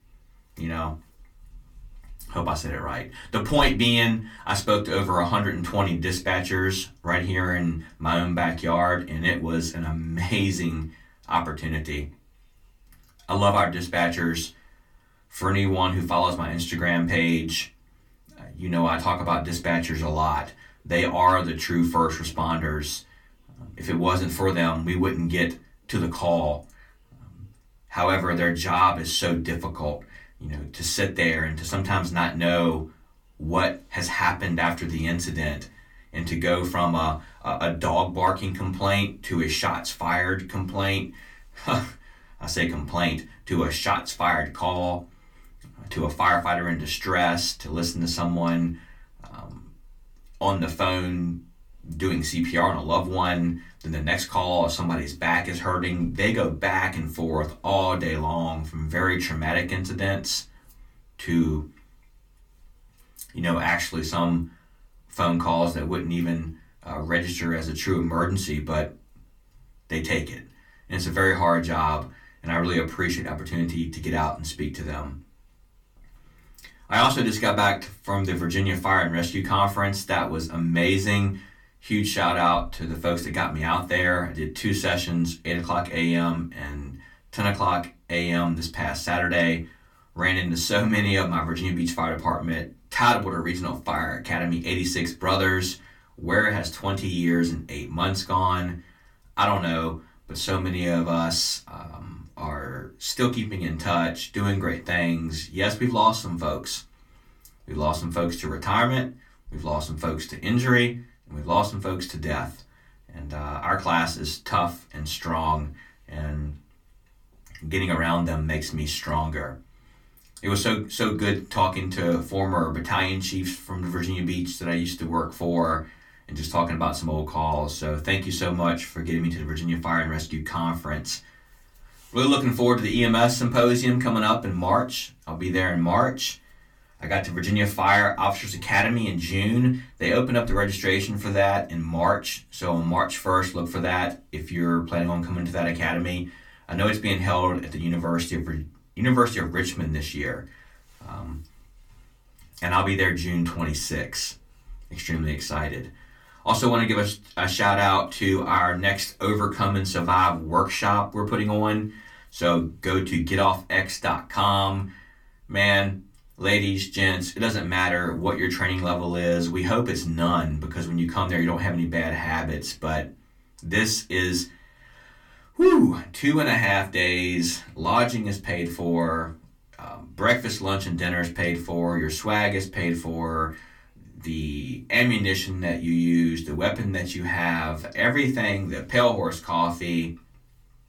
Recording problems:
off-mic speech; far
room echo; very slight; dies away in 0.2 s

